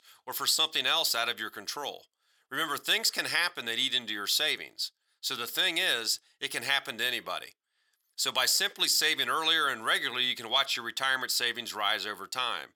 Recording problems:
thin; very; fading below 550 Hz

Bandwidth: 19 kHz